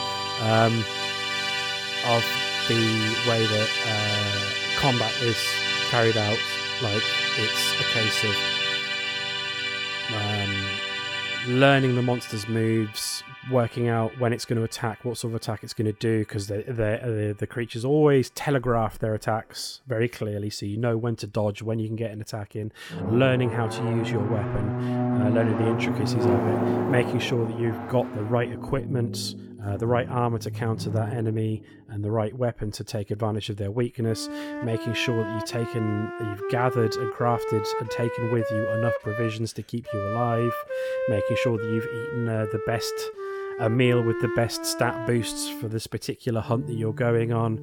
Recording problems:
background music; loud; throughout; 1 dB below the speech

